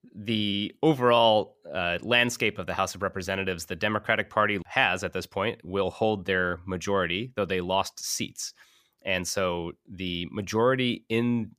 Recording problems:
none

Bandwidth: 15 kHz